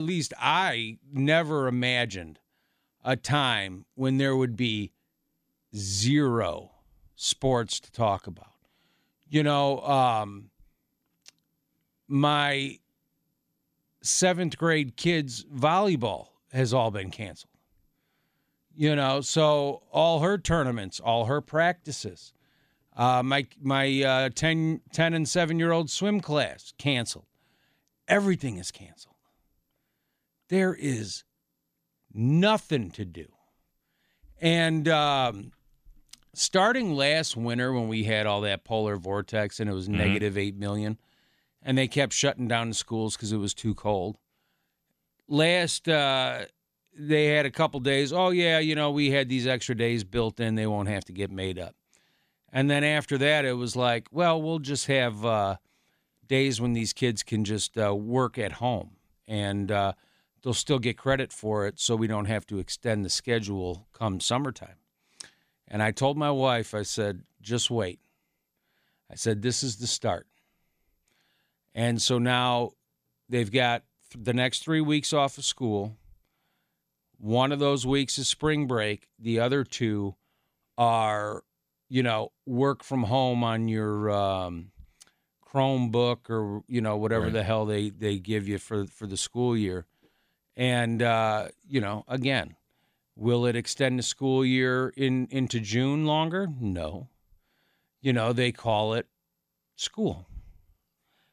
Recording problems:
abrupt cut into speech; at the start

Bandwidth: 15 kHz